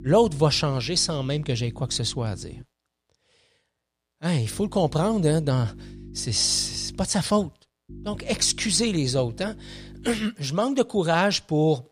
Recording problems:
electrical hum; faint; until 2.5 s, from 4.5 to 7 s and from 8 to 10 s; 50 Hz, 25 dB below the speech

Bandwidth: 15 kHz